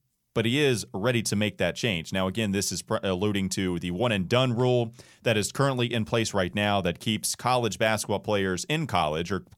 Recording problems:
none

